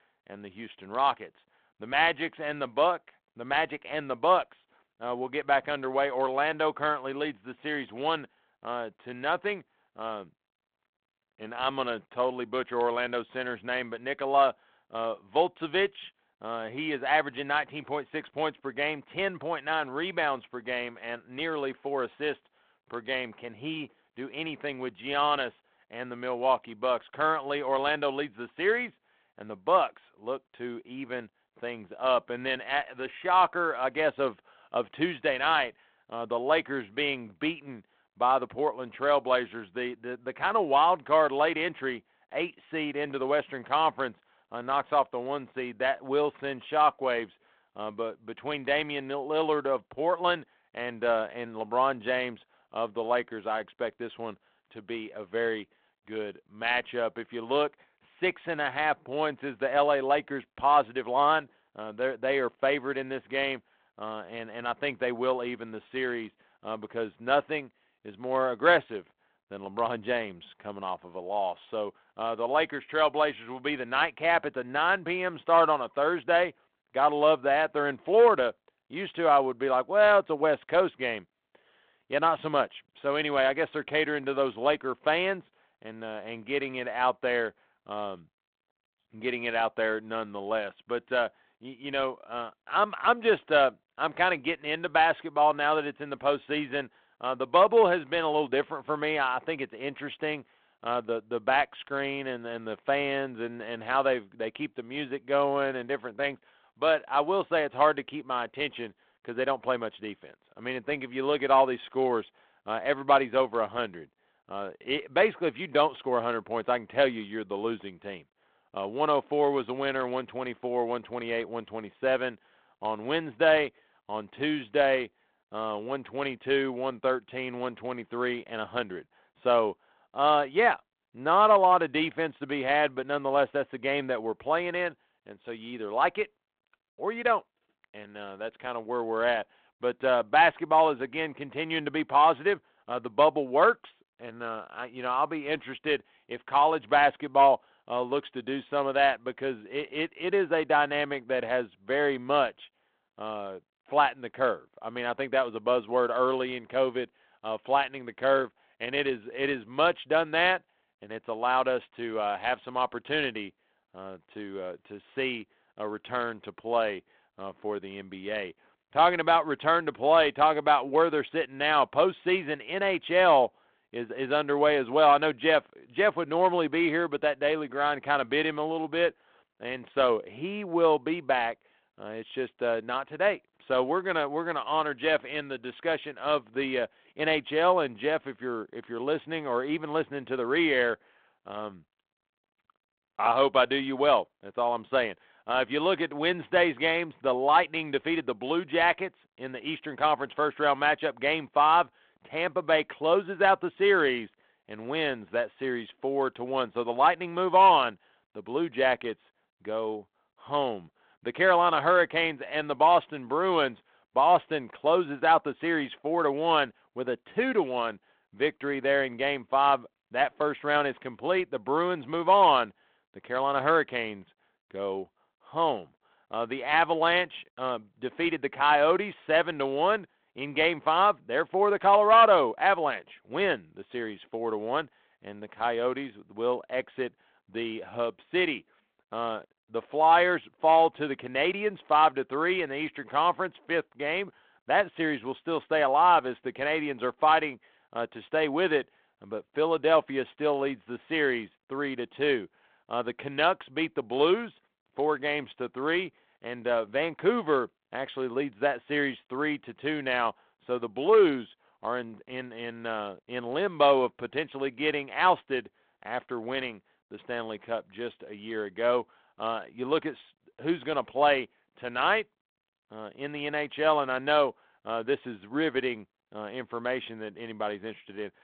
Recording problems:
phone-call audio

